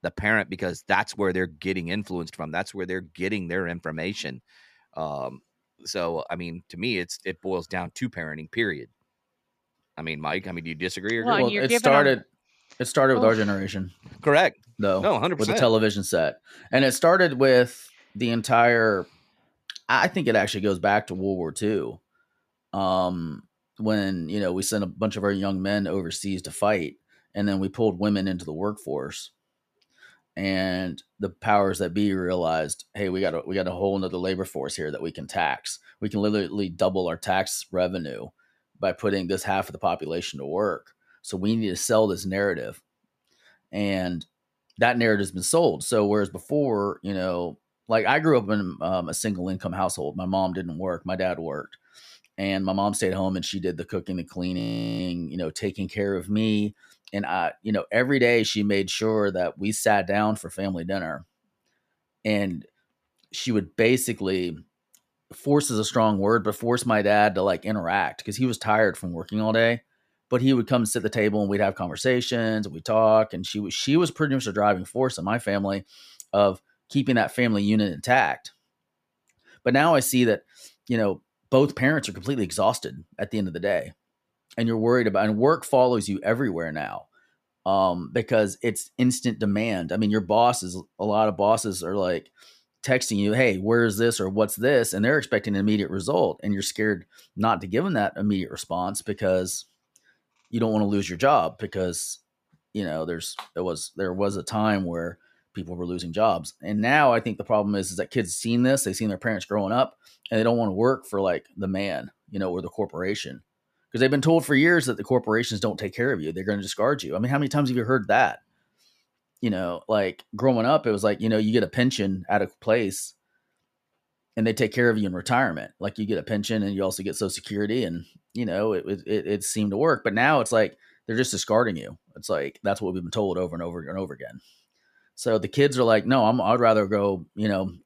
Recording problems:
audio freezing; at 55 s

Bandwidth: 14.5 kHz